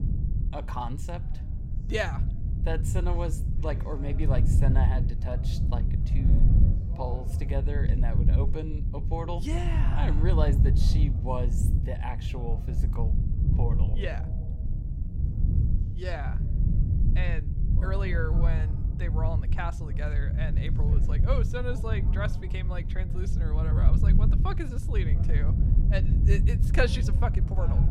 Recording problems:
wind noise on the microphone; heavy; 6 dB below the speech
voice in the background; noticeable; throughout; 20 dB below the speech

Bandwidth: 16 kHz